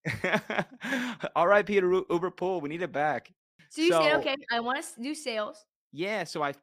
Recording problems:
none

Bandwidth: 15 kHz